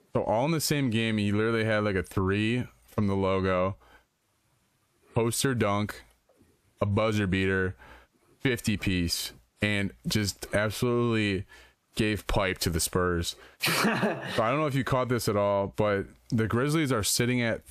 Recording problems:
squashed, flat; heavily

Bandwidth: 14.5 kHz